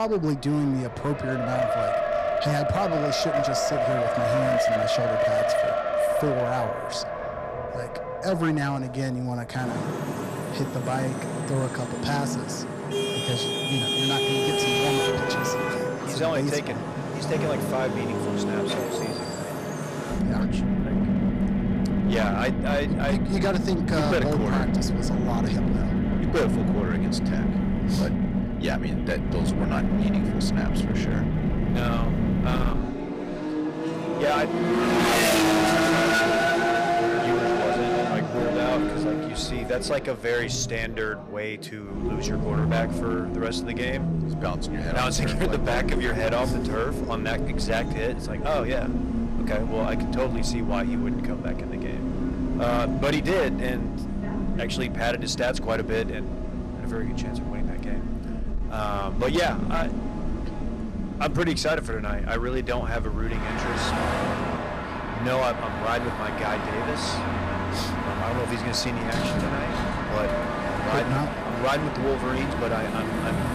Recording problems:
distortion; heavy; 10% of the sound clipped
traffic noise; very loud; throughout; 2 dB above the speech
abrupt cut into speech; at the start

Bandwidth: 15 kHz